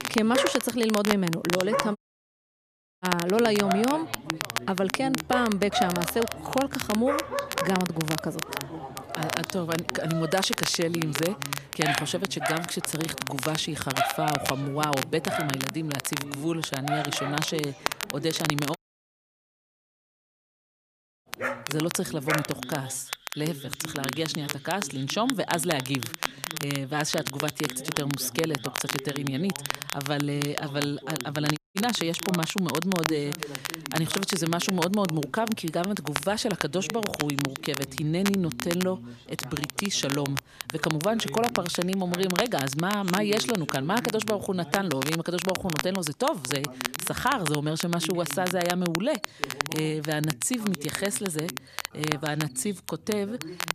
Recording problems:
animal sounds; loud; throughout; 7 dB below the speech
crackle, like an old record; loud; 5 dB below the speech
voice in the background; noticeable; throughout; 15 dB below the speech
audio cutting out; at 2 s for 1 s, at 19 s for 2.5 s and at 32 s

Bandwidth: 14.5 kHz